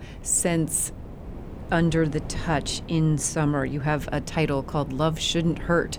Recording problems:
wind noise on the microphone; occasional gusts; 20 dB below the speech

